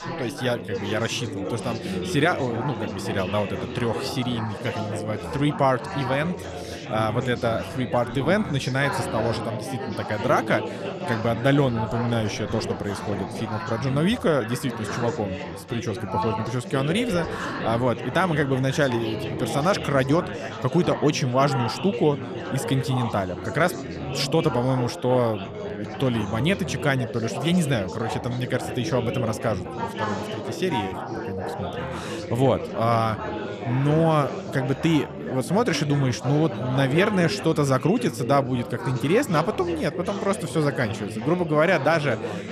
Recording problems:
chatter from many people; loud; throughout; 7 dB below the speech

